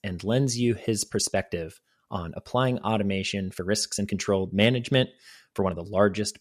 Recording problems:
uneven, jittery; strongly; from 1 to 6 s

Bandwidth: 14 kHz